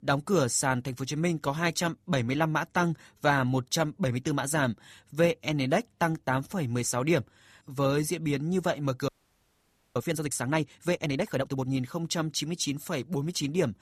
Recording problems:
audio freezing; at 9 s for 1 s

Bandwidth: 14.5 kHz